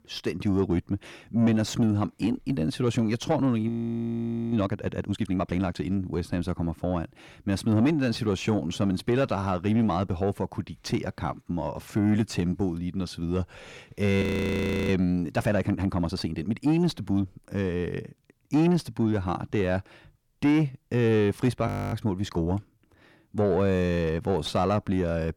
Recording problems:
distortion; slight; 10 dB below the speech
audio freezing; at 3.5 s for 1 s, at 14 s for 0.5 s and at 22 s

